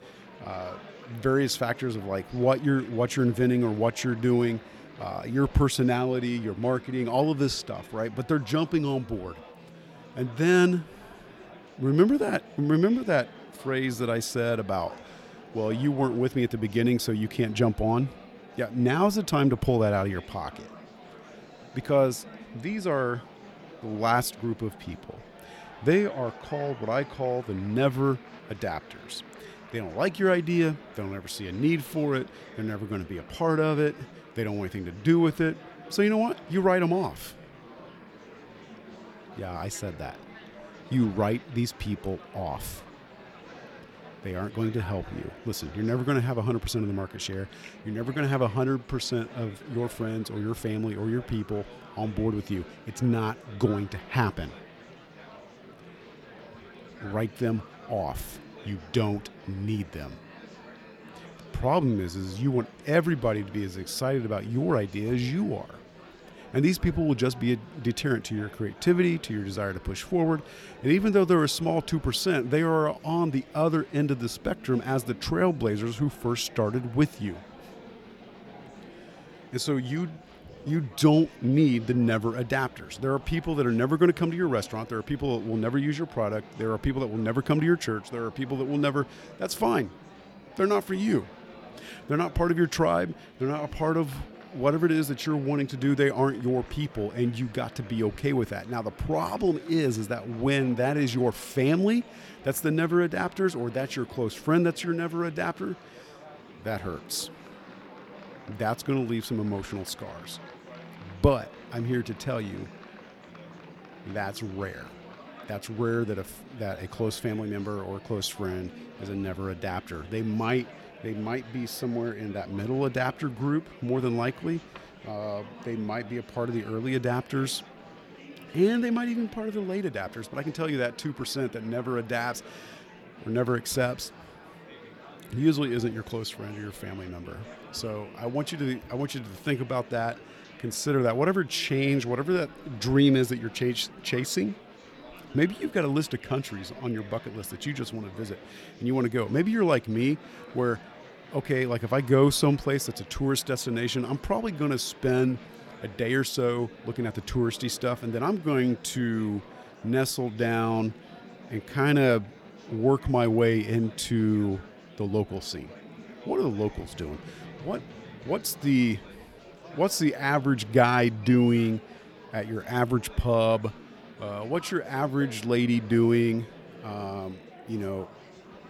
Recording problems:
murmuring crowd; noticeable; throughout; 20 dB below the speech

